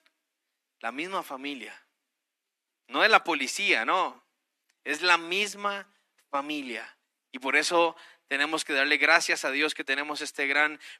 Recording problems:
thin; very; fading below 300 Hz

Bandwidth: 13.5 kHz